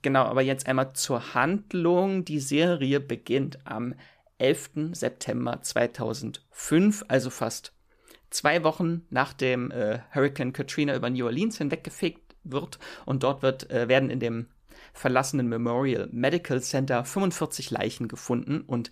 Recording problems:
none

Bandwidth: 14.5 kHz